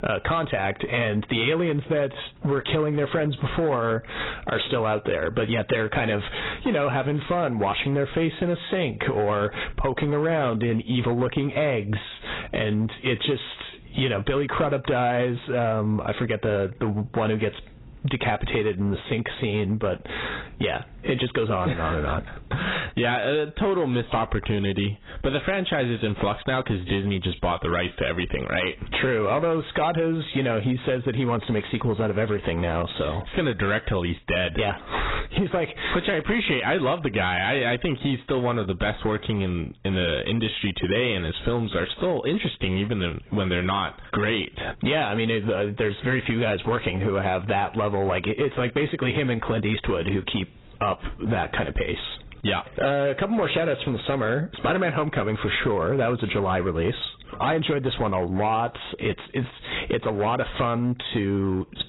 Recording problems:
garbled, watery; badly; nothing above 4 kHz
squashed, flat; heavily
distortion; slight; 7% of the sound clipped

